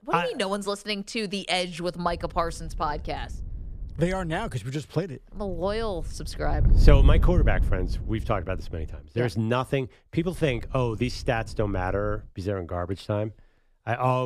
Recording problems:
wind noise on the microphone; occasional gusts; from 2 to 4.5 s, from 5.5 to 9 s and from 10 to 12 s; 15 dB below the speech
abrupt cut into speech; at the end

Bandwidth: 14.5 kHz